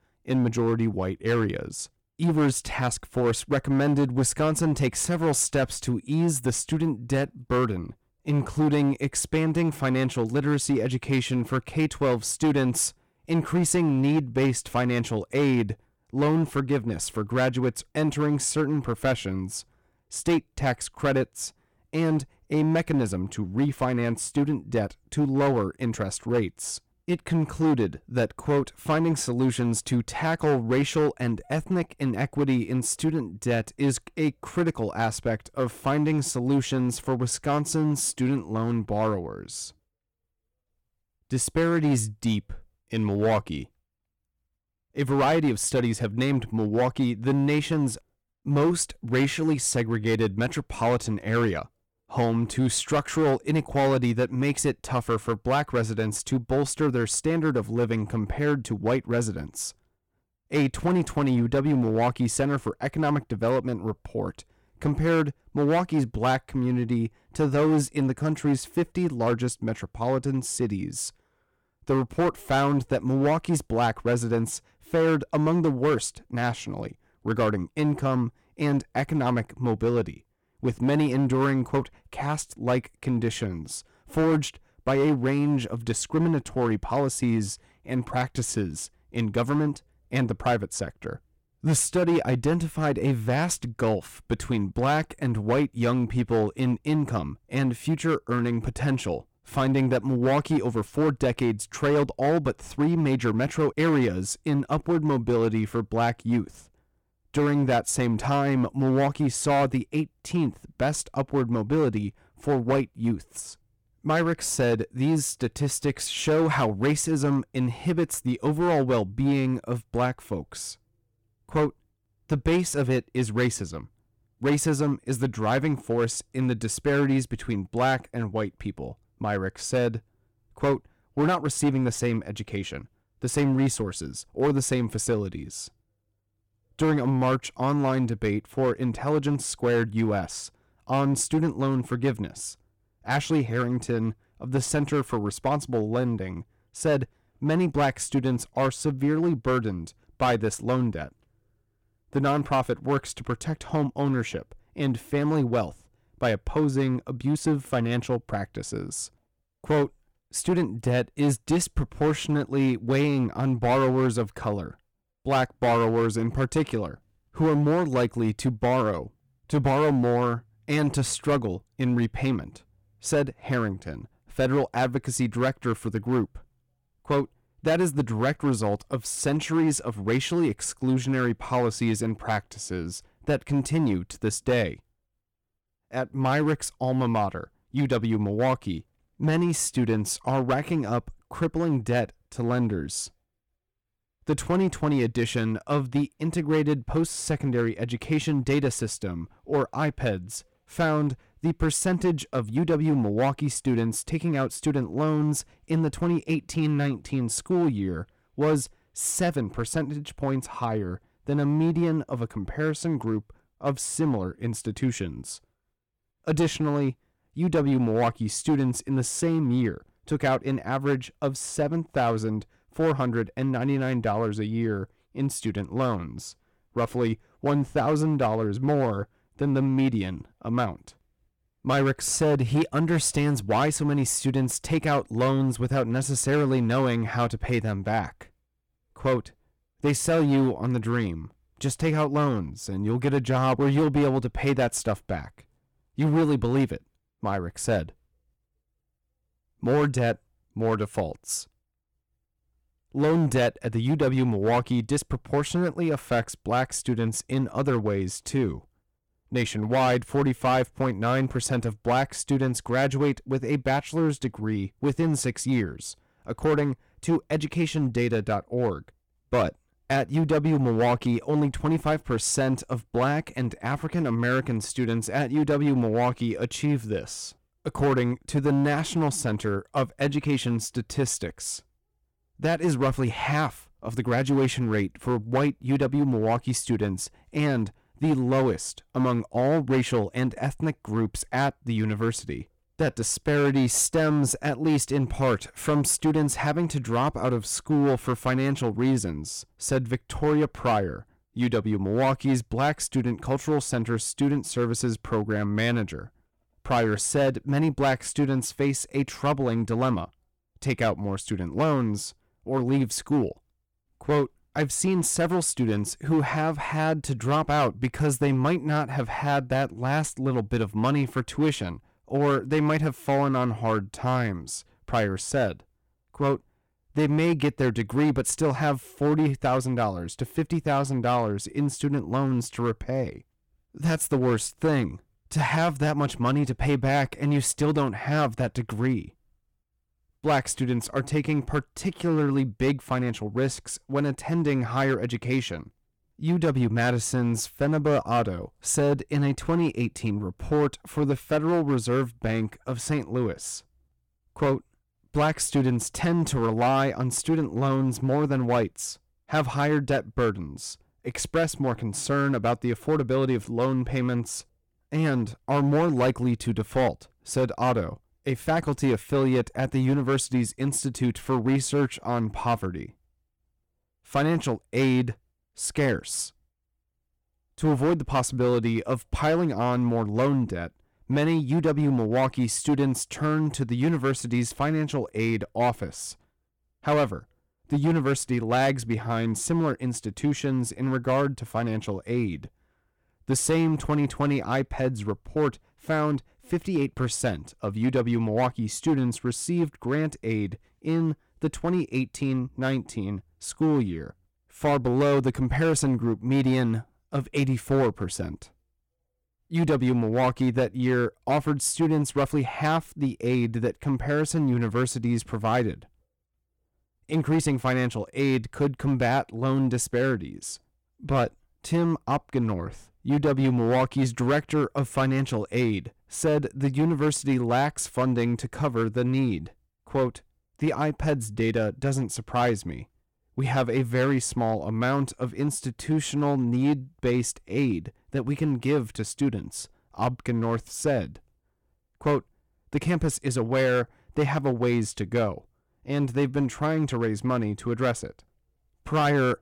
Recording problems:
distortion; slight; 7% of the sound clipped

